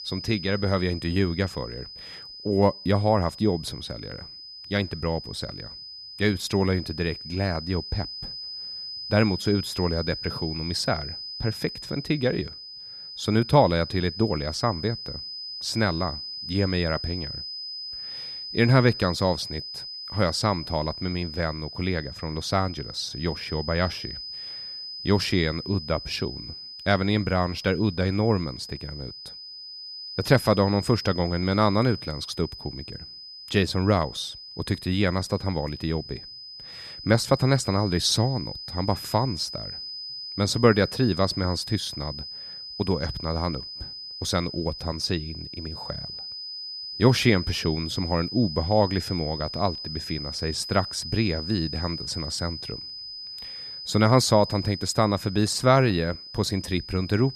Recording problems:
high-pitched whine; loud; throughout; 5 kHz, 9 dB below the speech

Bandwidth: 14 kHz